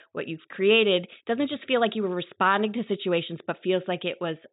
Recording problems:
high frequencies cut off; severe; nothing above 4 kHz

